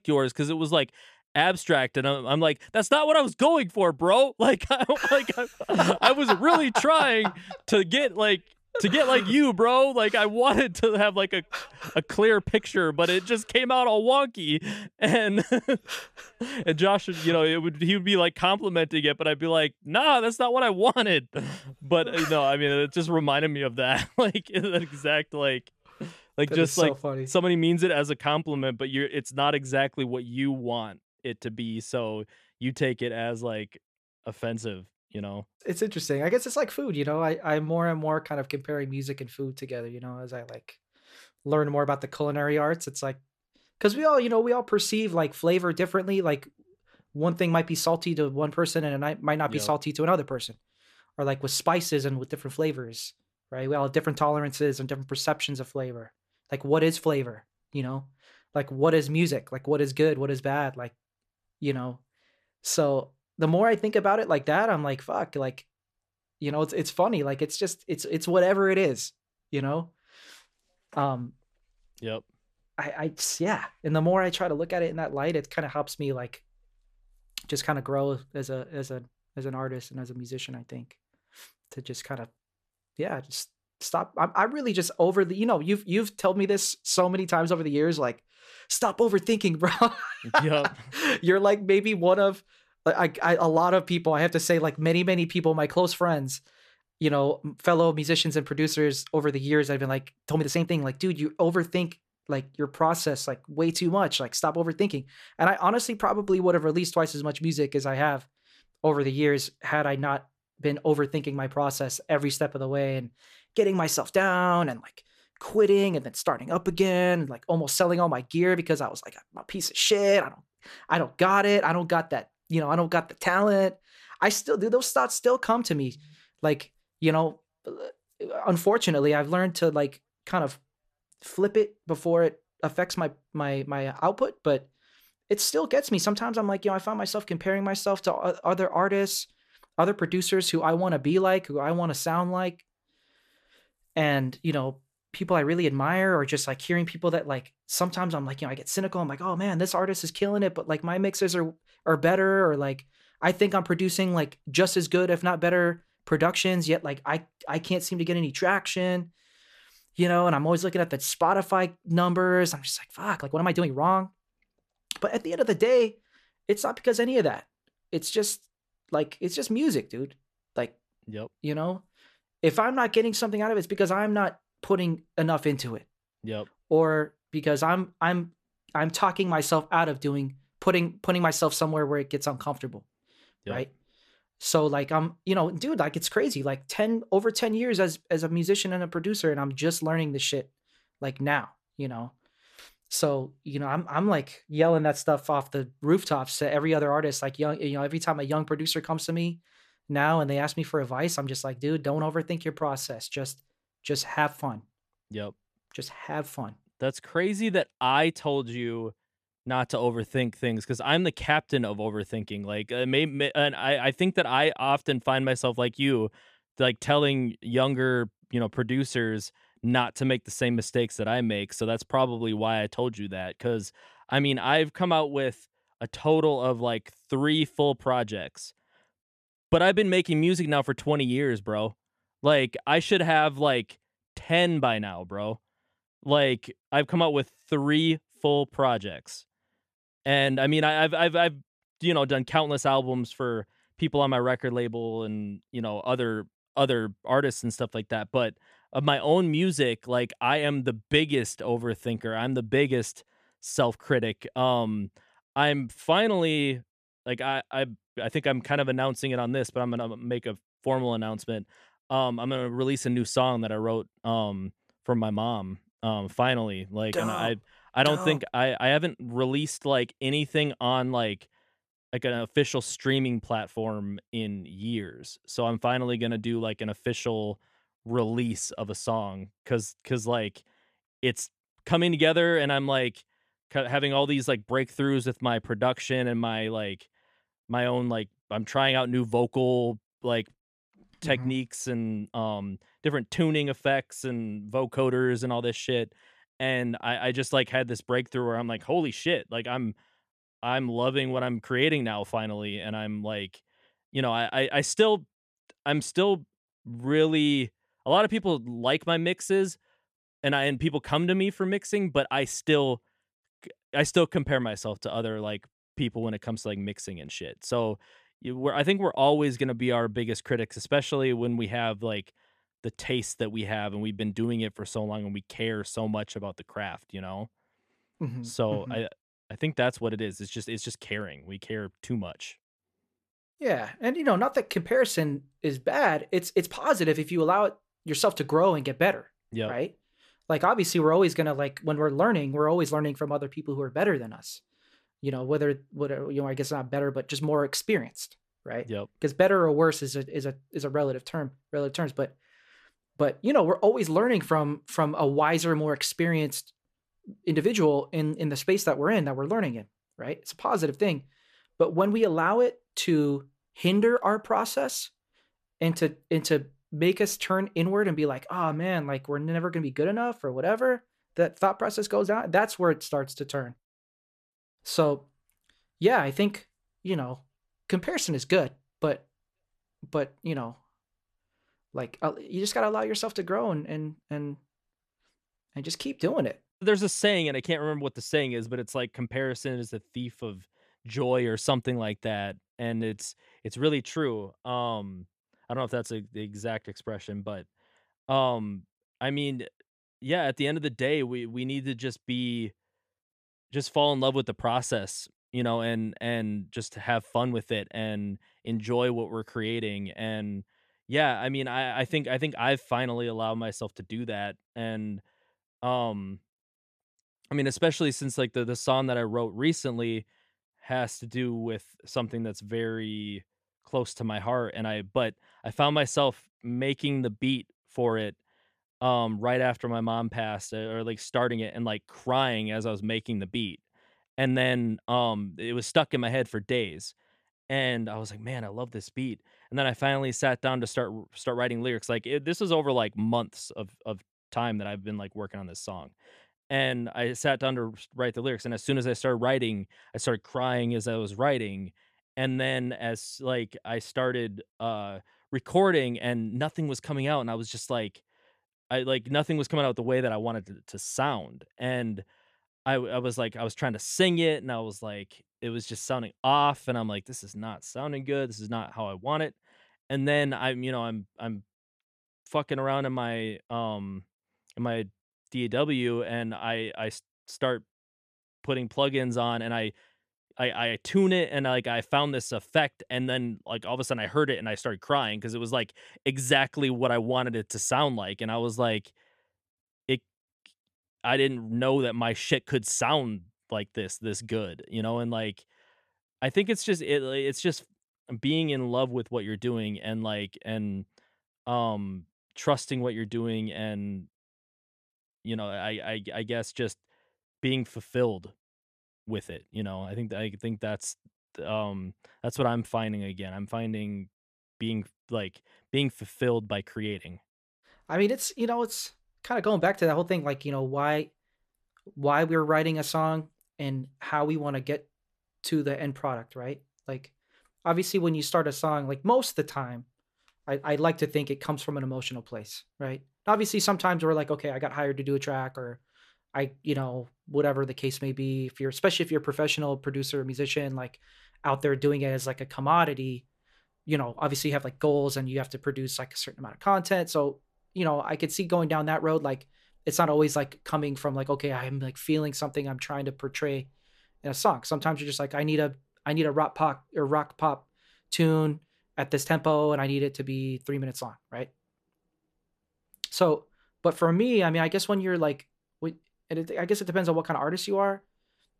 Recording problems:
uneven, jittery; strongly; from 44 s to 7:15

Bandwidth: 14.5 kHz